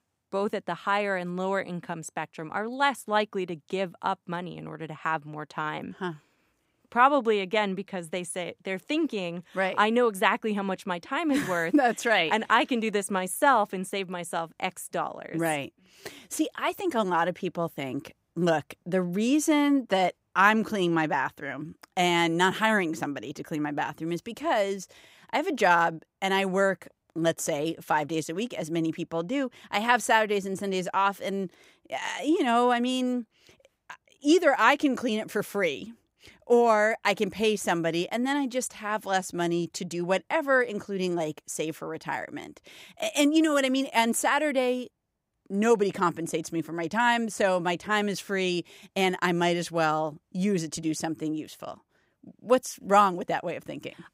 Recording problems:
none

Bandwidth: 15.5 kHz